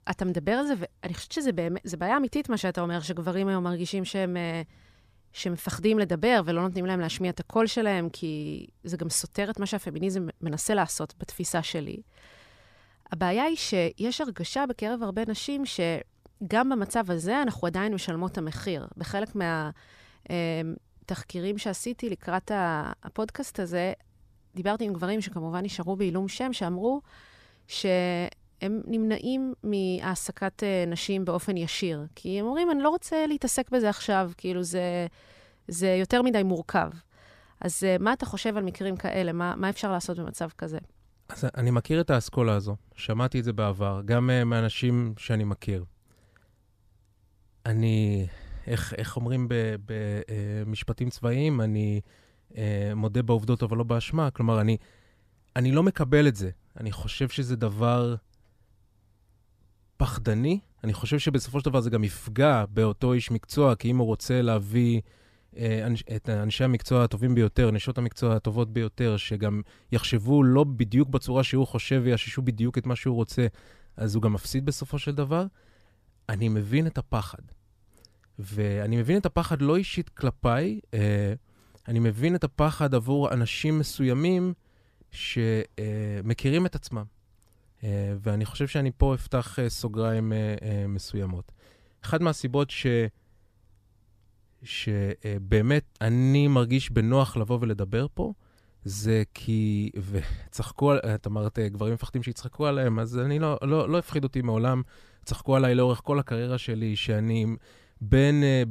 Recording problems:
abrupt cut into speech; at the end

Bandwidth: 14.5 kHz